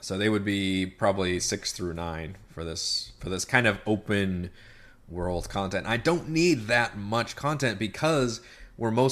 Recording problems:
abrupt cut into speech; at the end

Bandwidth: 14.5 kHz